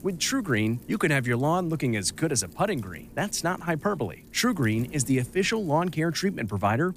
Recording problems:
wind noise on the microphone; occasional gusts; 25 dB below the speech

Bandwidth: 15 kHz